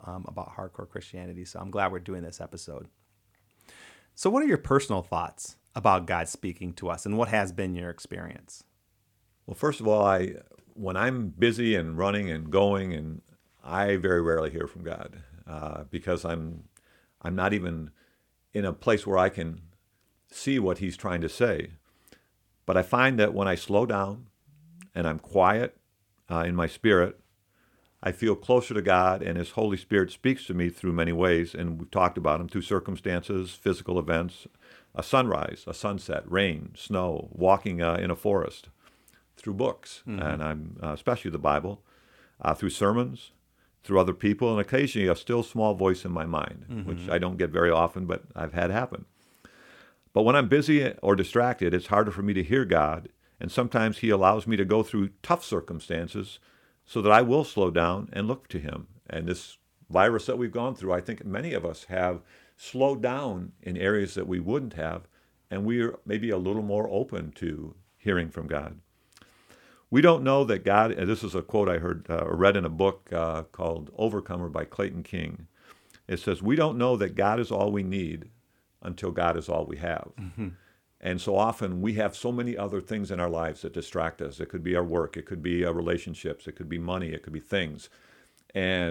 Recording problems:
abrupt cut into speech; at the end

